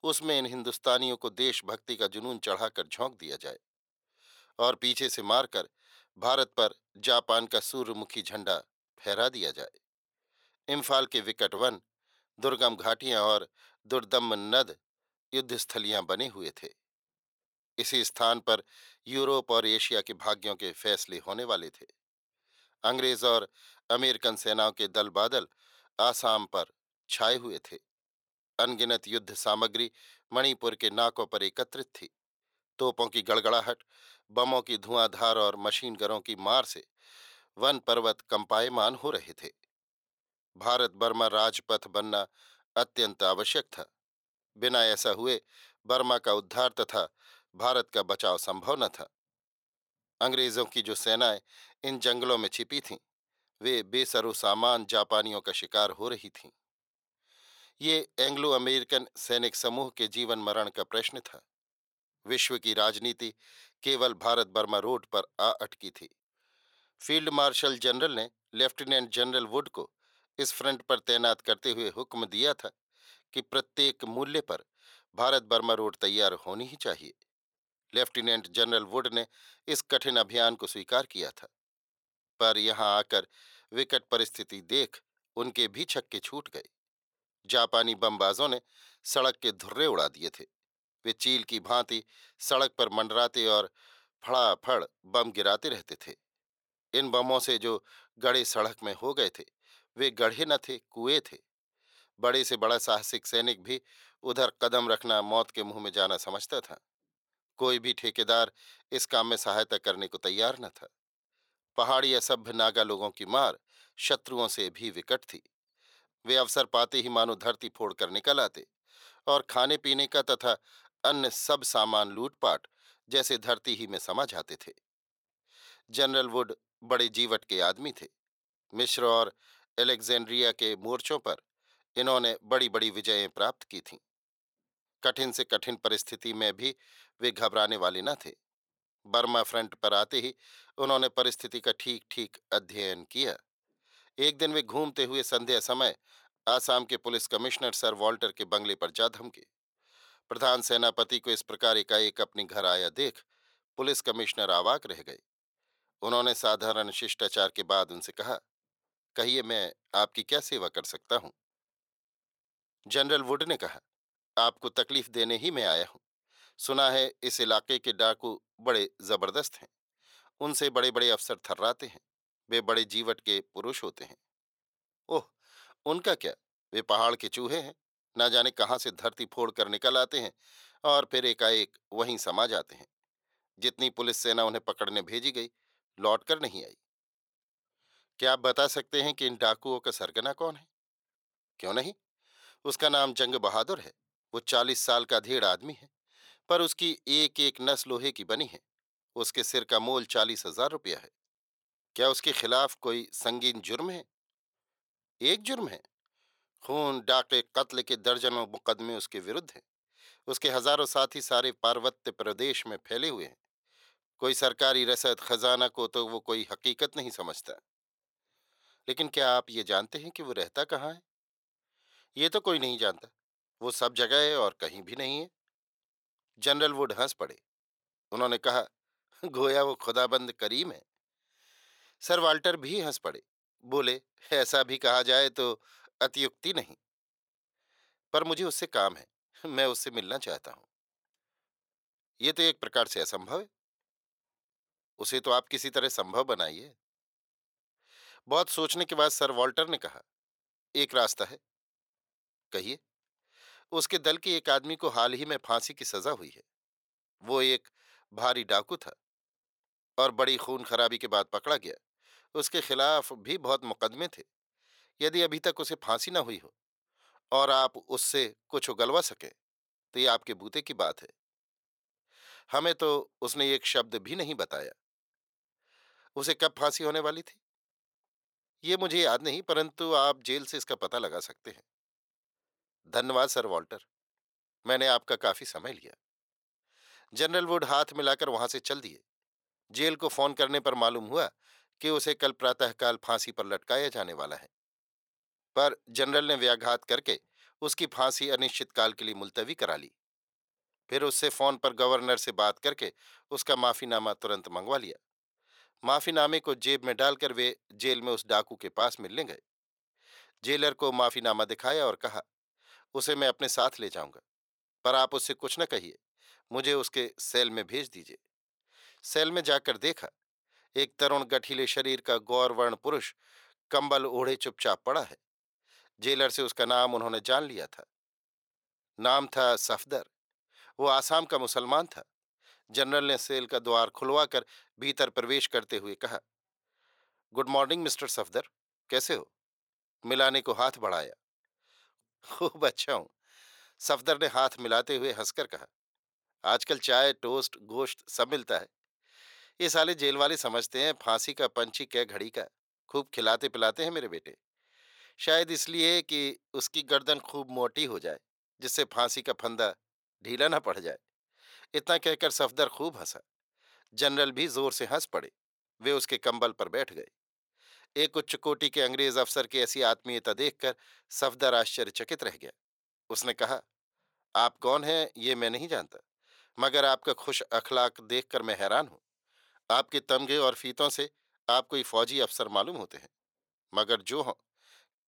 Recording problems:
thin; very; fading below 550 Hz

